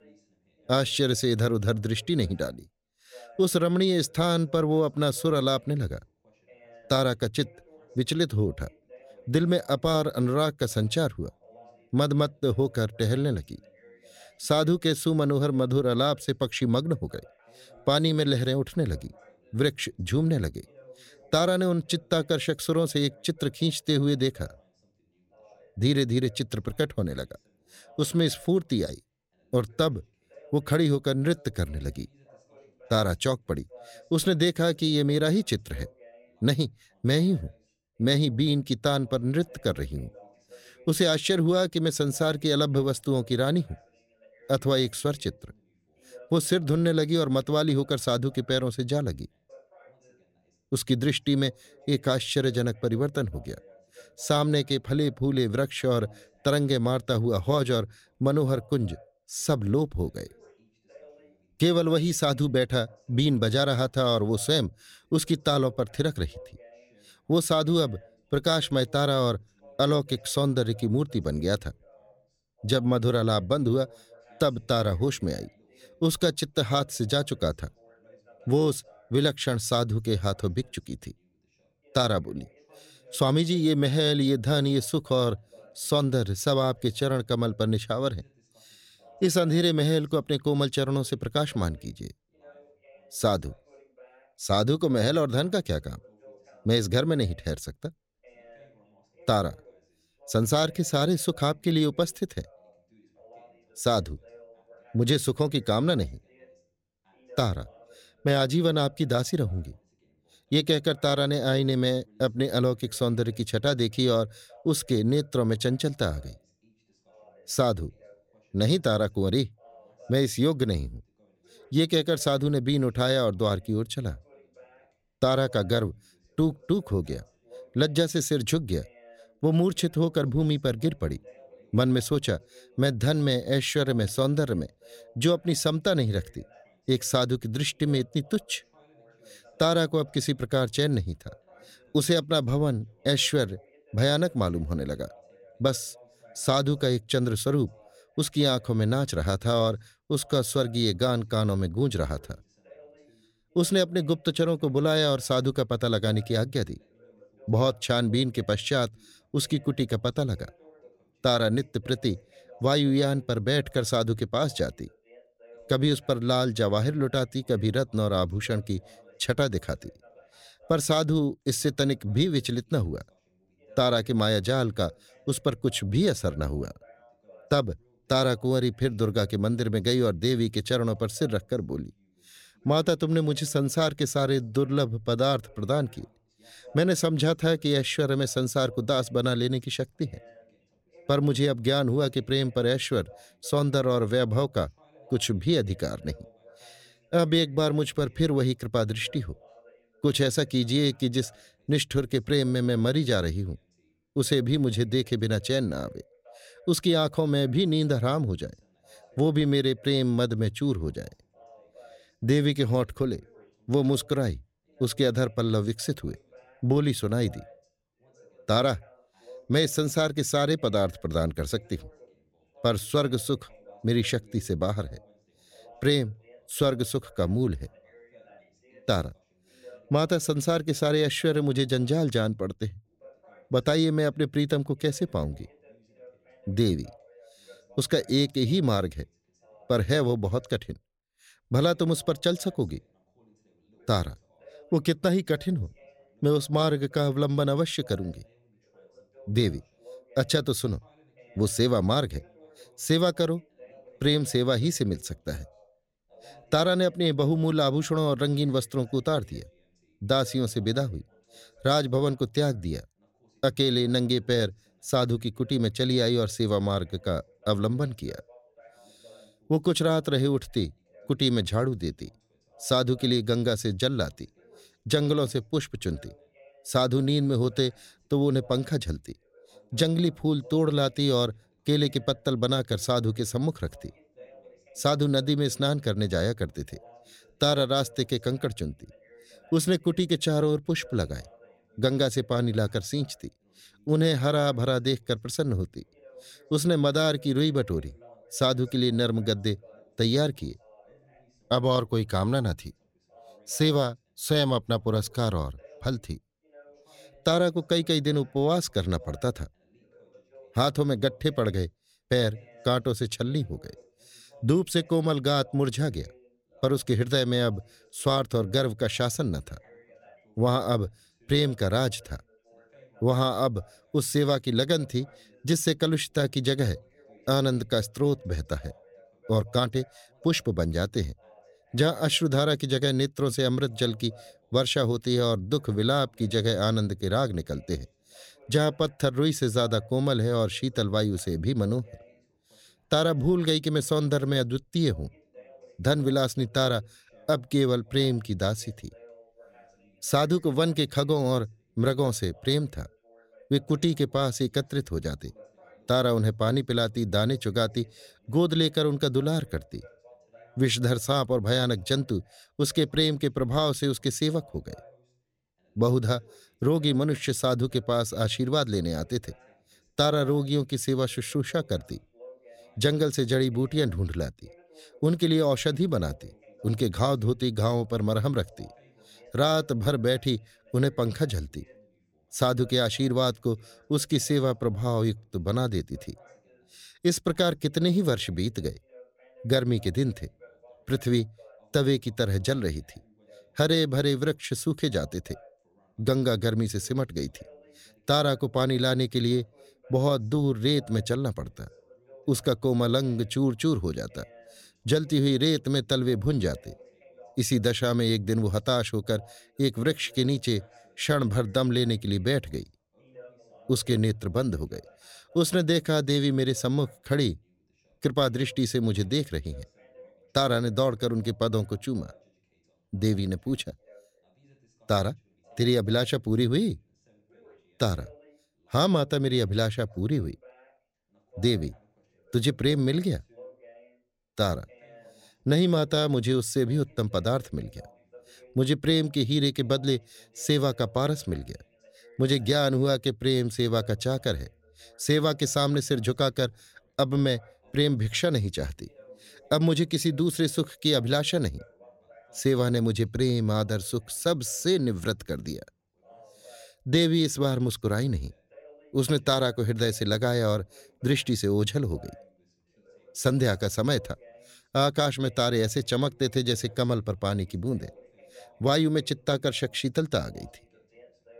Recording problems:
background chatter; faint; throughout; 2 voices, 30 dB below the speech

